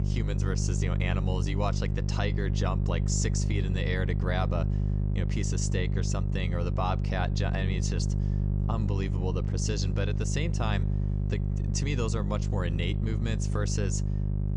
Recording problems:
electrical hum; loud; throughout; 50 Hz, 6 dB below the speech

